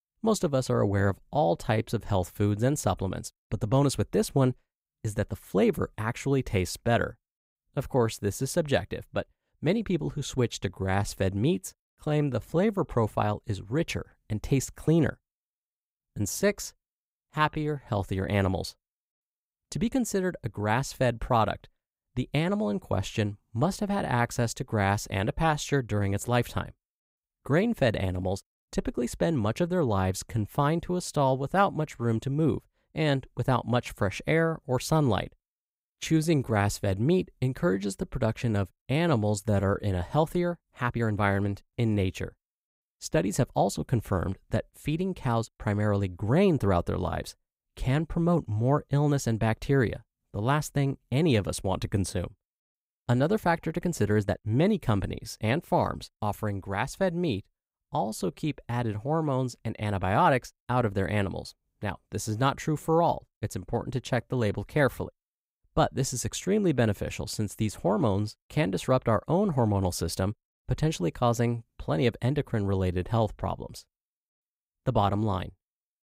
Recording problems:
uneven, jittery; strongly; from 1 s to 1:13

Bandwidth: 15.5 kHz